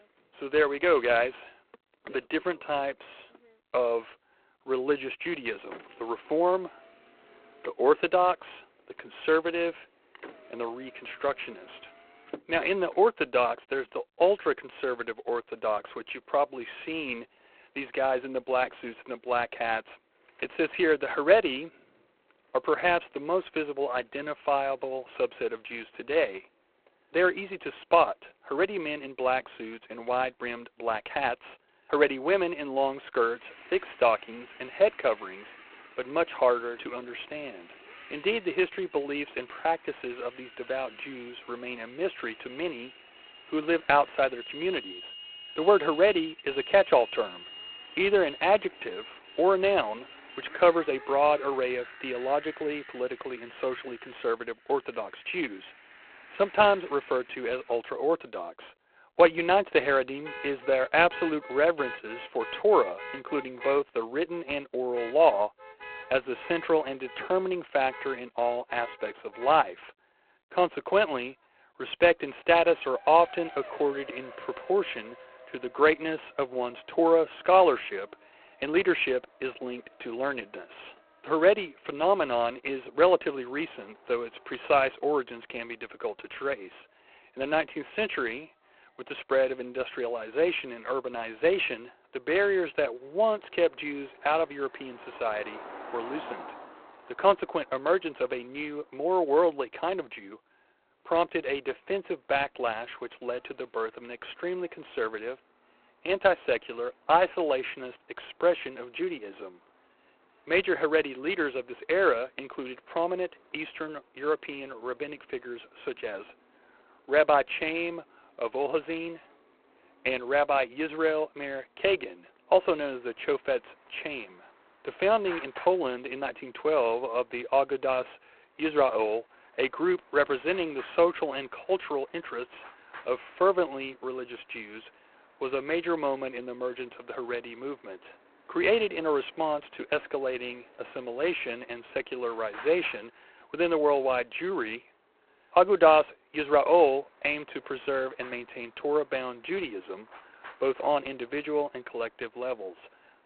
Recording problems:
phone-call audio; poor line; nothing above 3.5 kHz
traffic noise; noticeable; throughout; 20 dB below the speech

